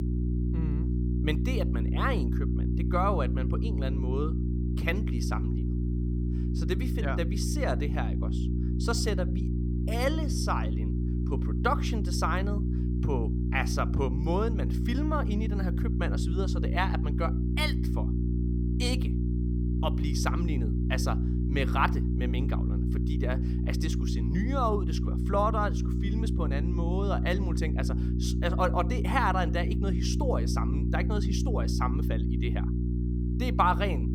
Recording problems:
electrical hum; loud; throughout; 60 Hz, 7 dB below the speech

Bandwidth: 17 kHz